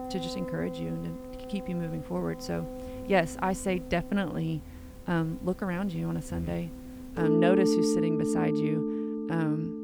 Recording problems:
background music; very loud; throughout; as loud as the speech

